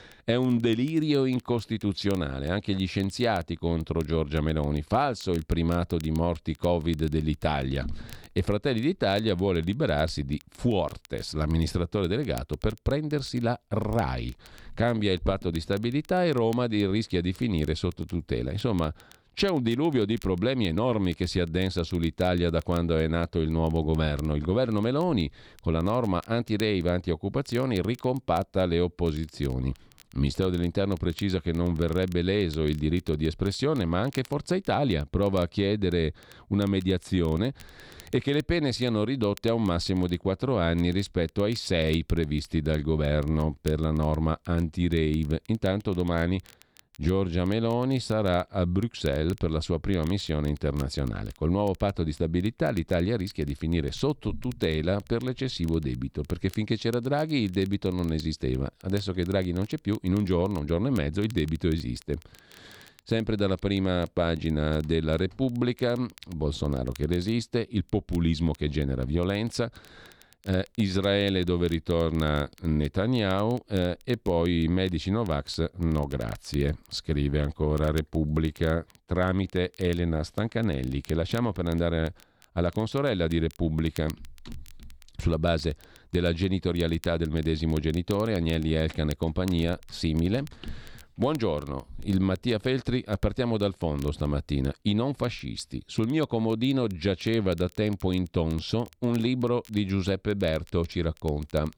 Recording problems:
crackle, like an old record; faint; 25 dB below the speech

